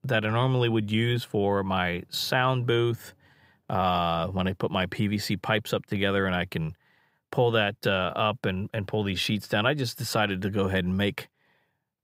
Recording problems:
none

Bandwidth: 15.5 kHz